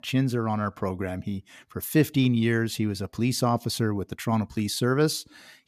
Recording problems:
none

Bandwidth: 14.5 kHz